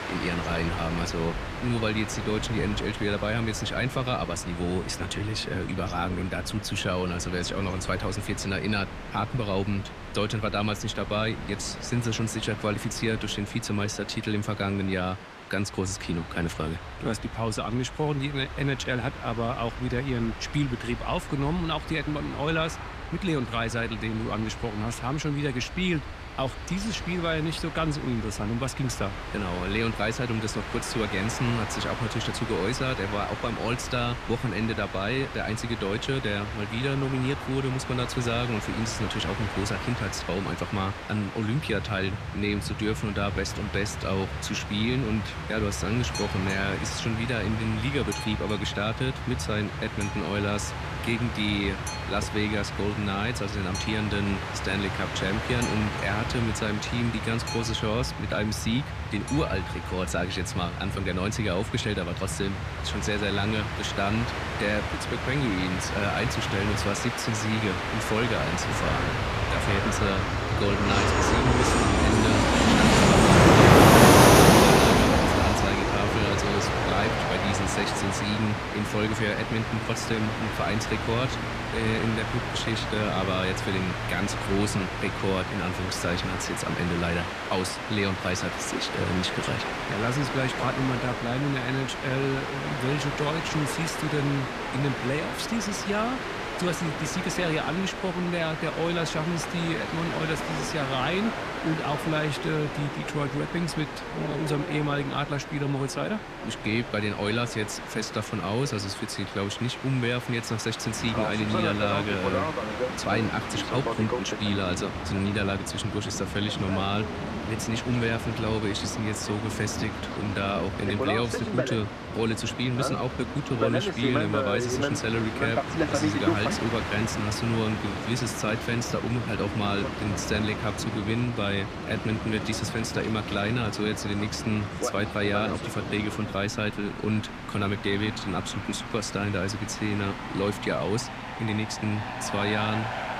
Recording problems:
train or aircraft noise; very loud; throughout; as loud as the speech

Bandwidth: 14.5 kHz